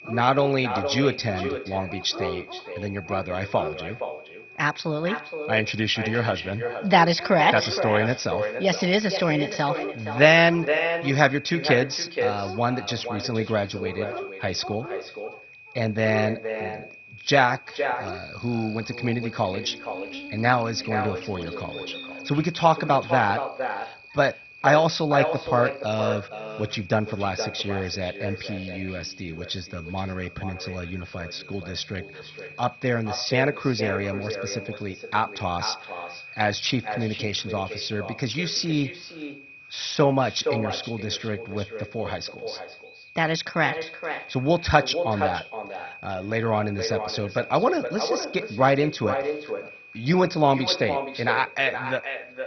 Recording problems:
echo of what is said; strong; throughout; 470 ms later, 8 dB below the speech
garbled, watery; badly; nothing above 6 kHz
high-pitched whine; noticeable; throughout; 2.5 kHz, 15 dB below the speech
animal sounds; noticeable; throughout; 15 dB below the speech

